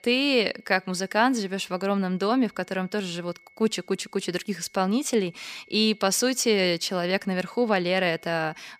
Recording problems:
high-pitched whine; faint; throughout; 2 kHz, 30 dB below the speech

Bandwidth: 15 kHz